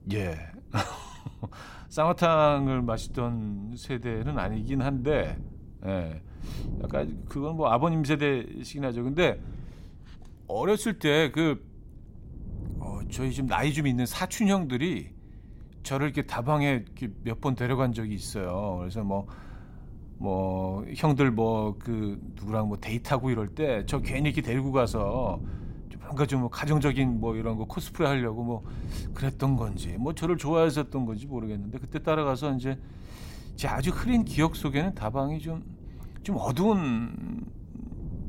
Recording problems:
wind noise on the microphone; occasional gusts; 25 dB below the speech

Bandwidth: 16 kHz